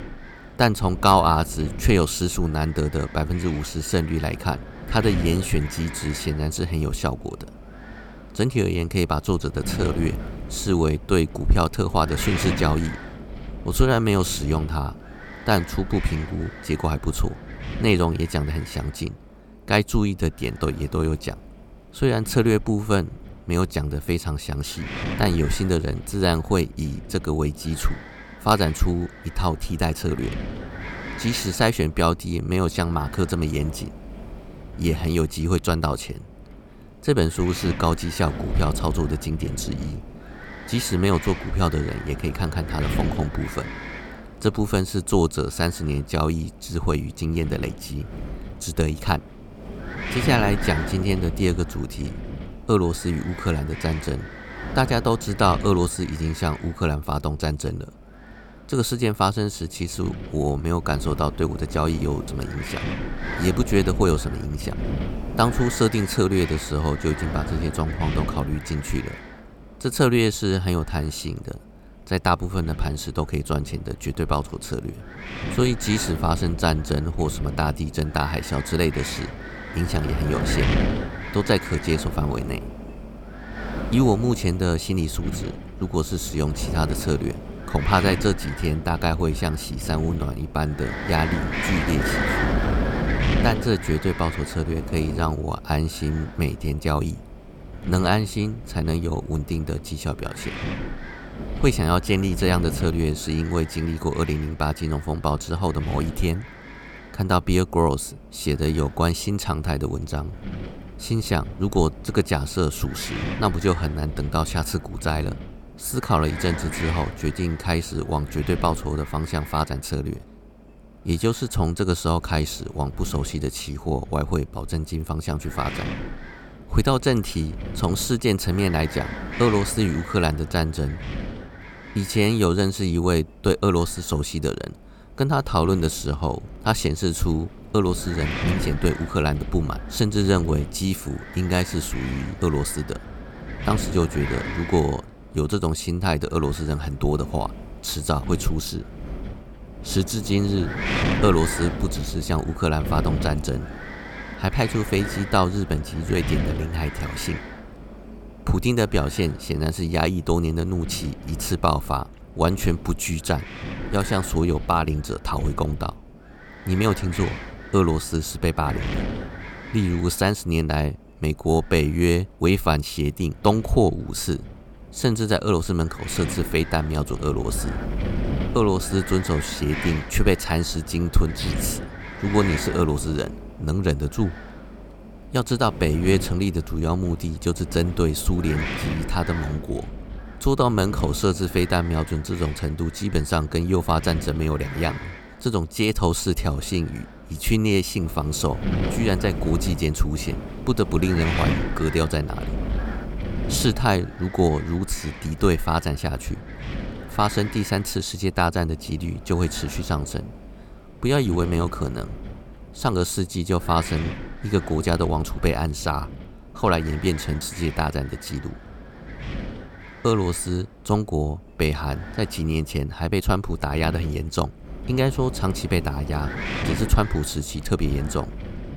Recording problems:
wind noise on the microphone; heavy; 9 dB below the speech

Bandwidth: 18 kHz